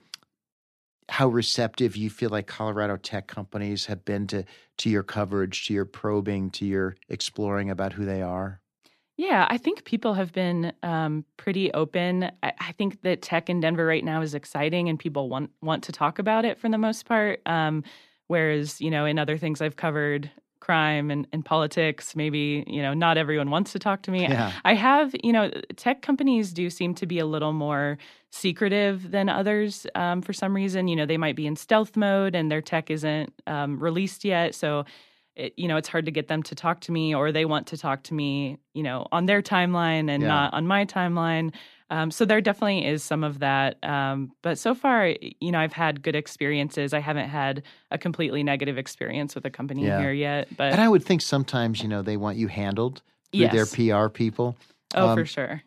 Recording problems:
none

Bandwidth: 14 kHz